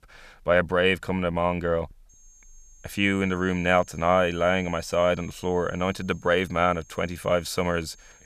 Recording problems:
high-pitched whine; faint; from 2 s on; 6.5 kHz, 25 dB below the speech

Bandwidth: 14.5 kHz